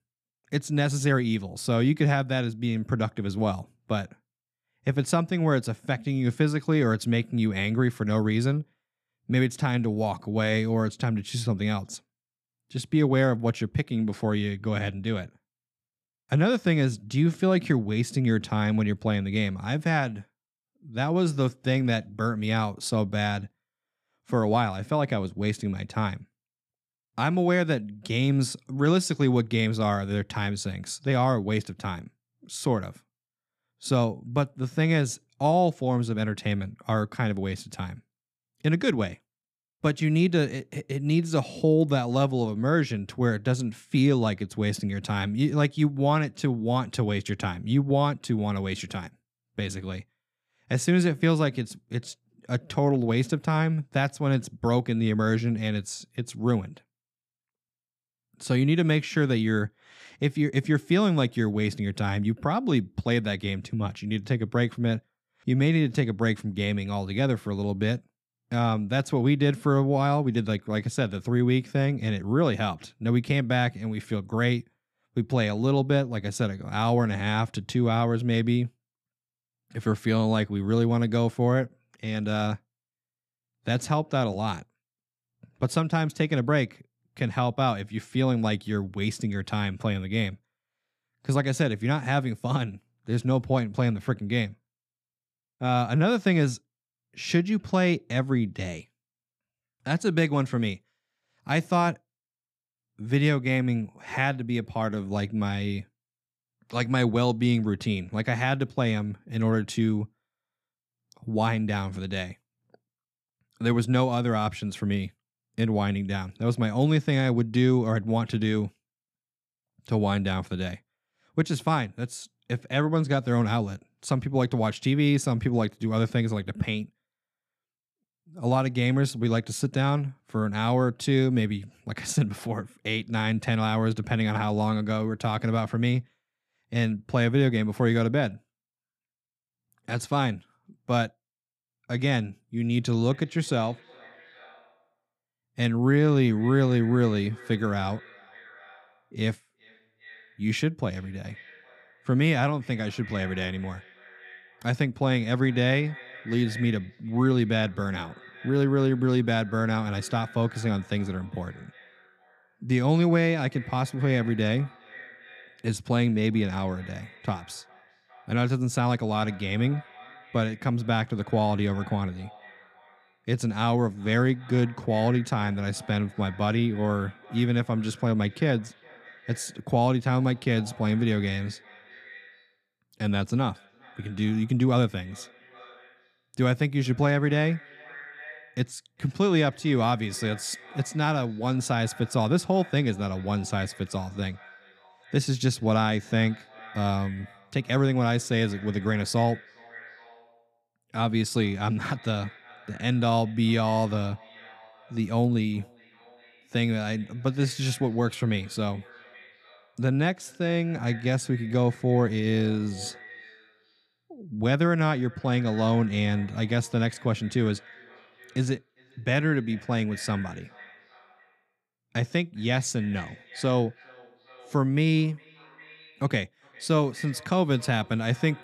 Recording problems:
echo of what is said; faint; from 2:23 on; 400 ms later, 20 dB below the speech

